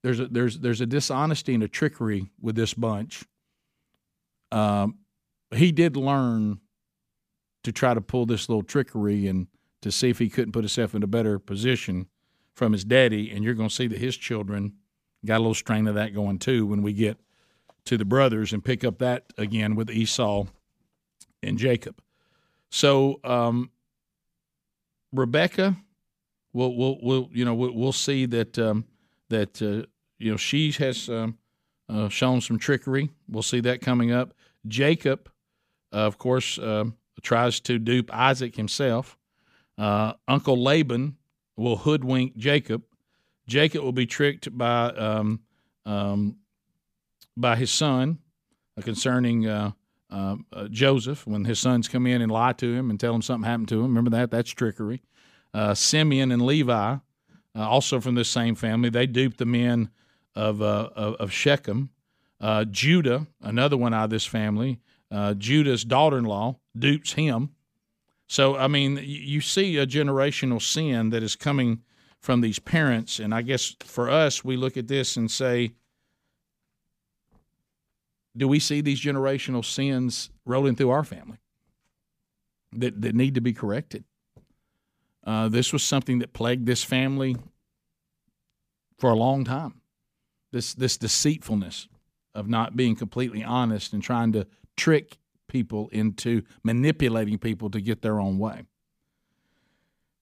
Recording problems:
none

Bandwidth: 15 kHz